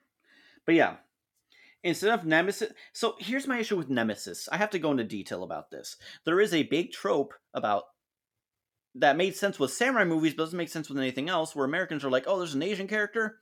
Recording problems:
none

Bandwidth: 17.5 kHz